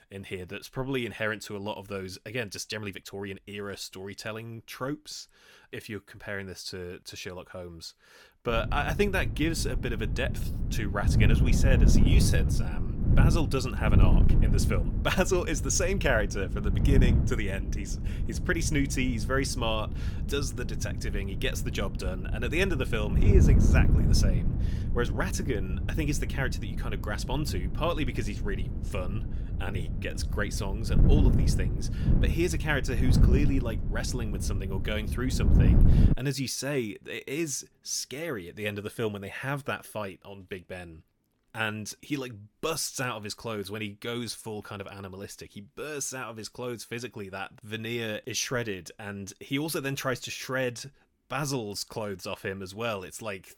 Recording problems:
wind noise on the microphone; heavy; from 8.5 to 36 s; 7 dB below the speech
uneven, jittery; strongly; from 2.5 to 30 s

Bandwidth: 17.5 kHz